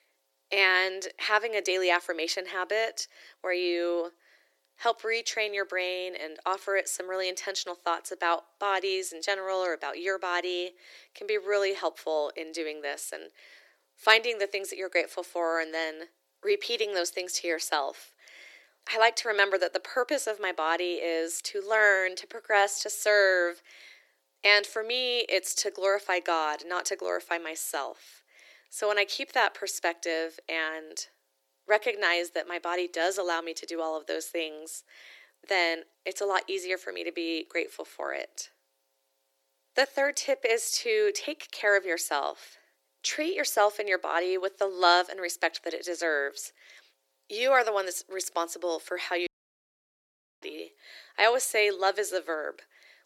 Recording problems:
thin; very; fading below 350 Hz
audio cutting out; at 49 s for 1 s

